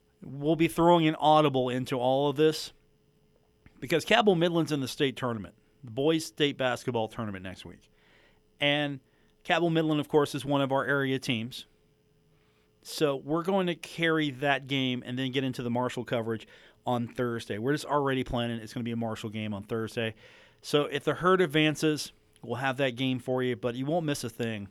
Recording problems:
none

